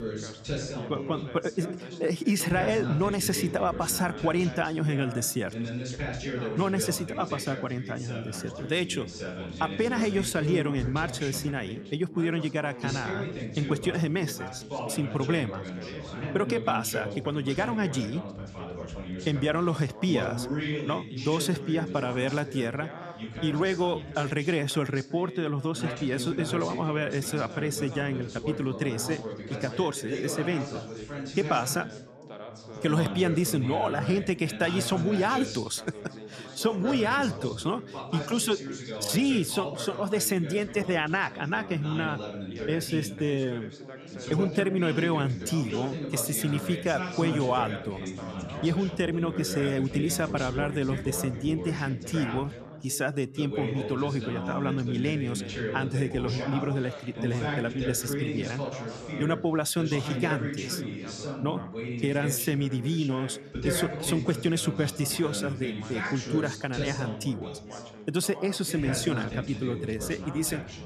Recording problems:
background chatter; loud; throughout; 3 voices, 7 dB below the speech

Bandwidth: 14 kHz